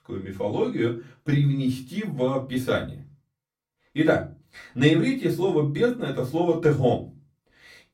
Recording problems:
off-mic speech; far
room echo; very slight; dies away in 0.2 s

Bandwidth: 16.5 kHz